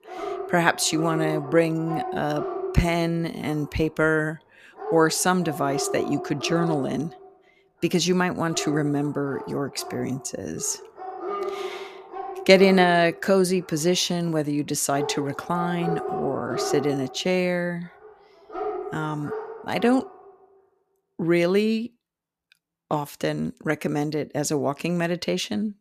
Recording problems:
animal sounds; loud; until 20 s; 9 dB below the speech

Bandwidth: 14.5 kHz